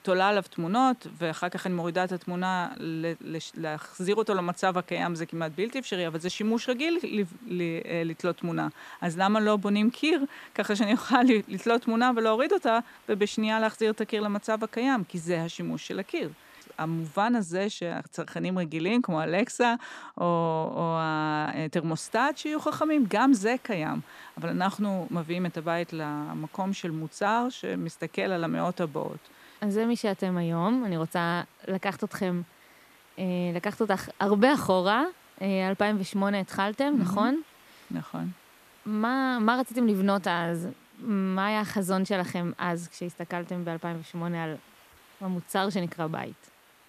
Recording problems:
hiss; faint; until 17 s and from 22 s on; 30 dB below the speech

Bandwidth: 14.5 kHz